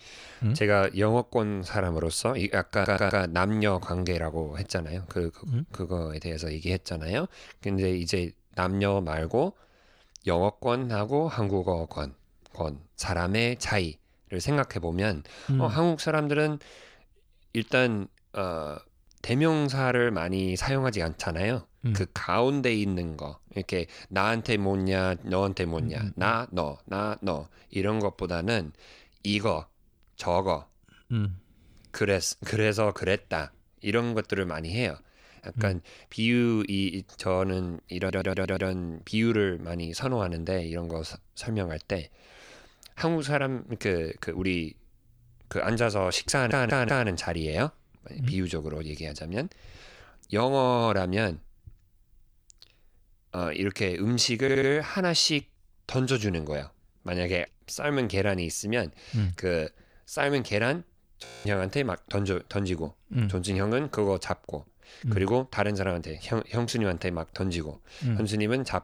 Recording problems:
audio stuttering; 4 times, first at 2.5 s
audio freezing; at 1:01

